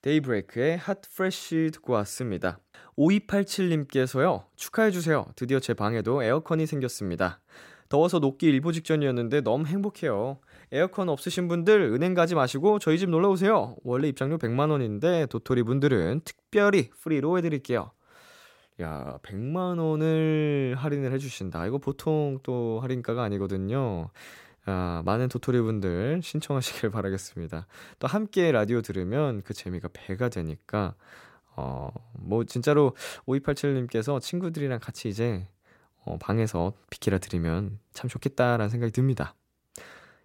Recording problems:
none

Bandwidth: 16 kHz